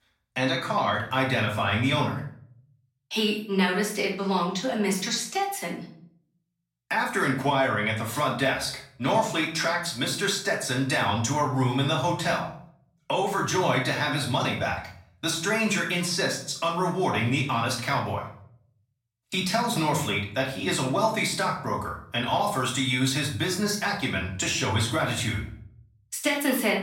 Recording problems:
off-mic speech; far
room echo; slight; dies away in 0.5 s

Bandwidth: 16 kHz